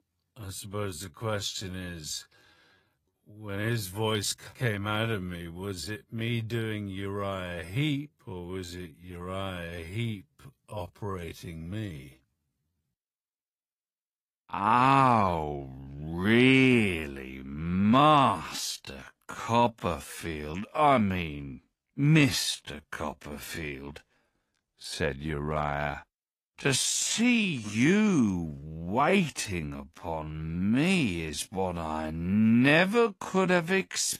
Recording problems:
wrong speed, natural pitch; too slow; 0.5 times normal speed
garbled, watery; slightly; nothing above 14.5 kHz

